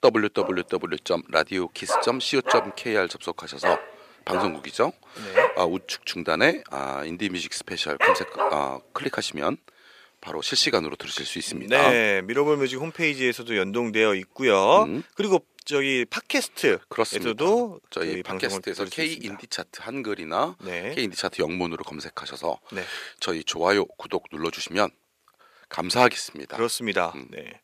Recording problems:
thin; somewhat; fading below 350 Hz
dog barking; loud; until 8.5 s; peak 4 dB above the speech

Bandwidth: 15 kHz